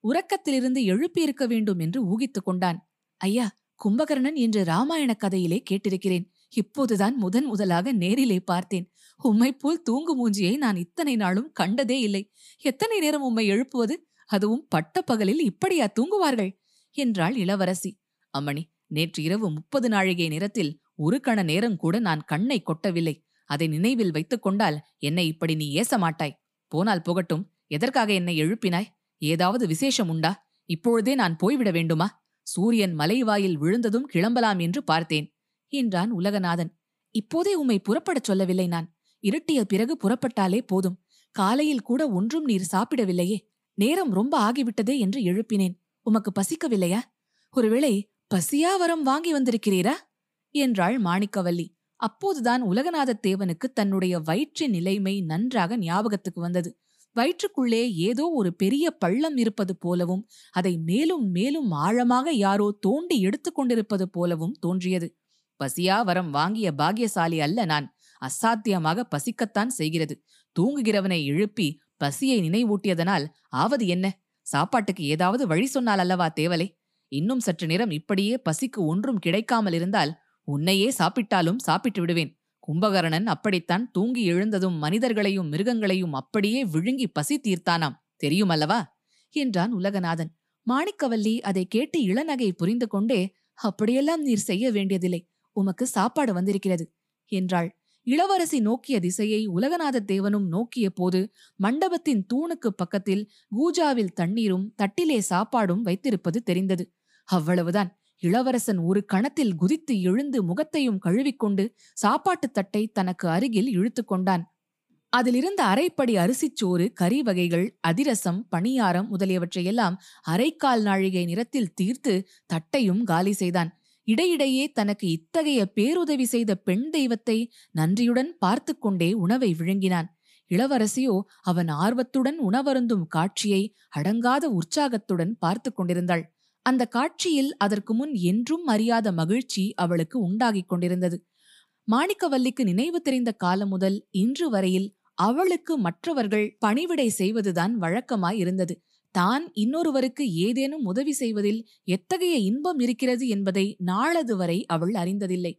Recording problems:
none

